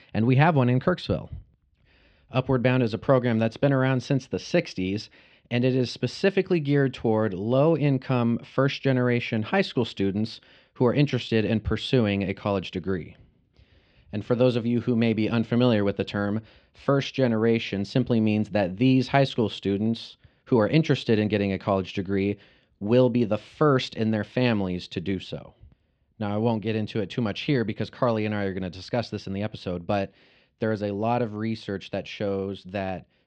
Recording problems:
muffled; slightly; fading above 3.5 kHz

